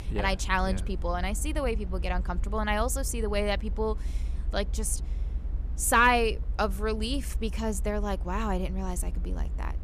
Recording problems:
low rumble; faint; throughout; 25 dB below the speech

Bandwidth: 14.5 kHz